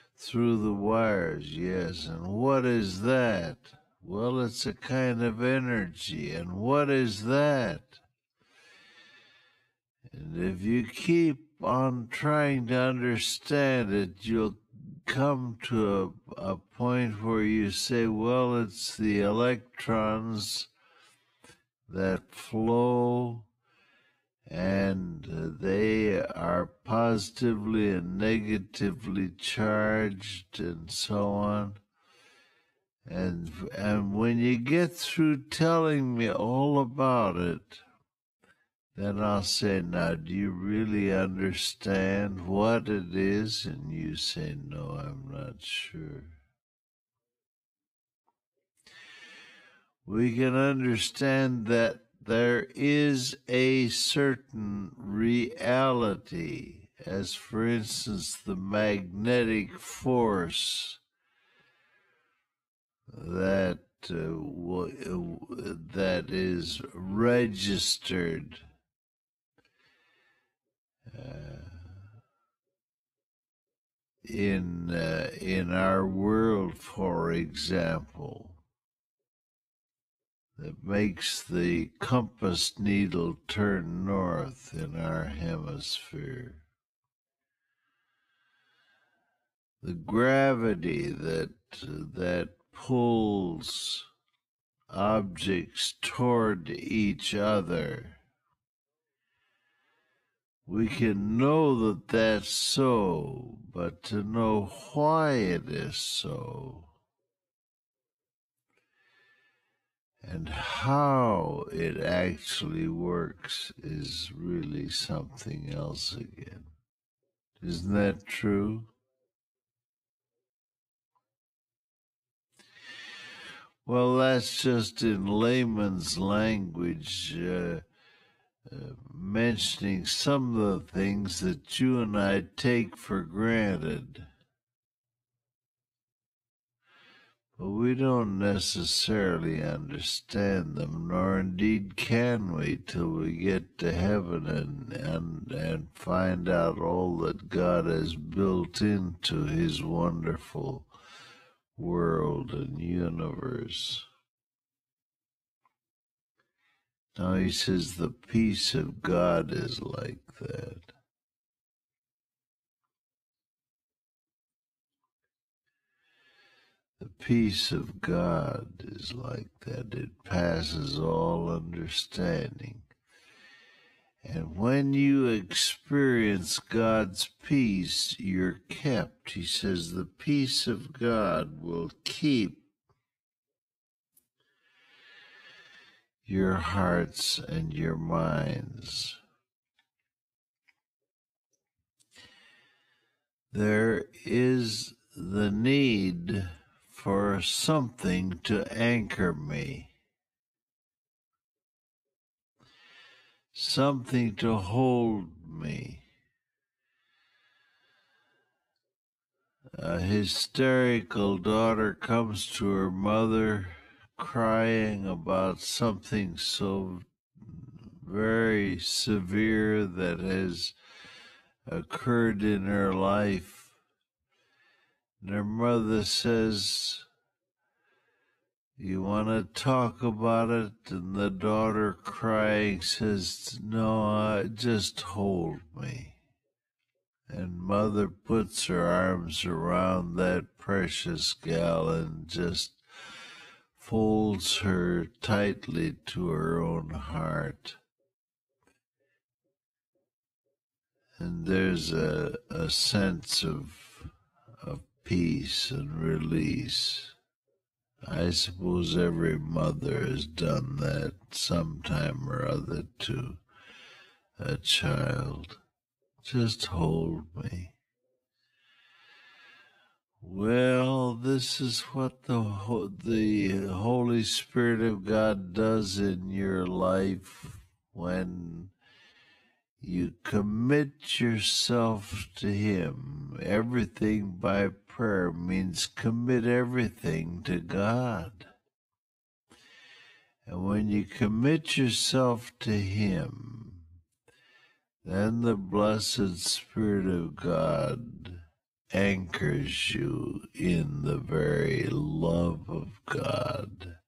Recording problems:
wrong speed, natural pitch; too slow; 0.5 times normal speed

